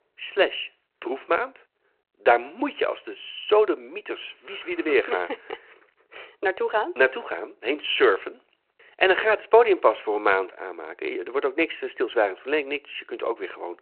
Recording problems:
phone-call audio

